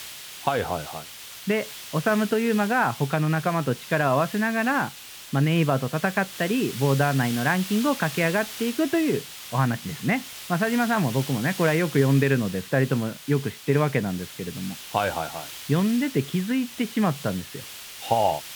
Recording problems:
high frequencies cut off; severe; nothing above 4 kHz
hiss; noticeable; throughout; 10 dB below the speech

